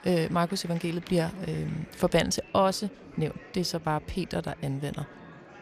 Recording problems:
murmuring crowd; noticeable; throughout; 20 dB below the speech

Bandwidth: 14.5 kHz